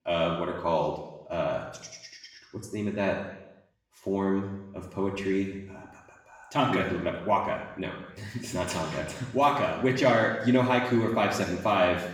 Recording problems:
off-mic speech; far
room echo; noticeable; dies away in 0.9 s

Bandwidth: 18.5 kHz